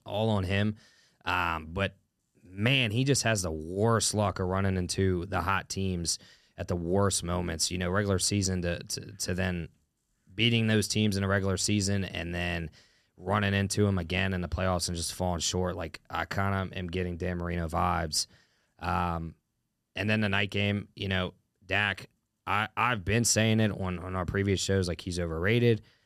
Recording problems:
none

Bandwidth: 13.5 kHz